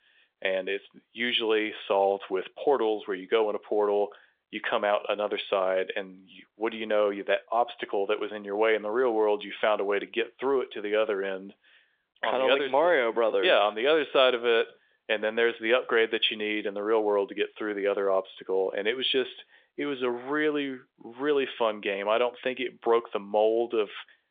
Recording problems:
phone-call audio; nothing above 3.5 kHz

